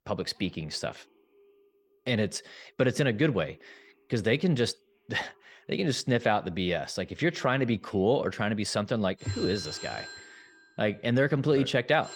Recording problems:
alarms or sirens; noticeable; throughout; 15 dB below the speech

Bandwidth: 18.5 kHz